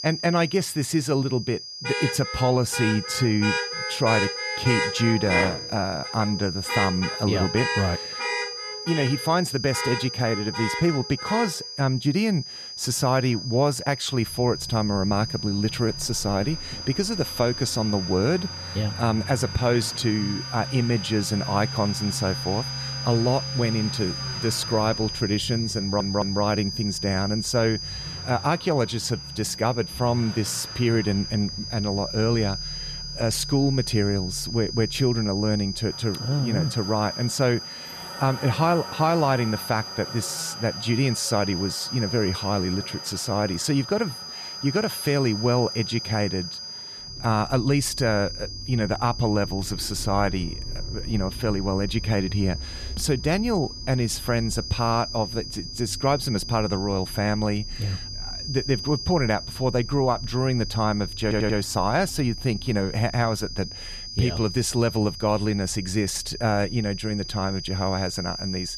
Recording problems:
high-pitched whine; loud; throughout; 5 kHz, 8 dB below the speech
traffic noise; noticeable; throughout; 10 dB below the speech
audio stuttering; at 26 s and at 1:01

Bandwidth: 14.5 kHz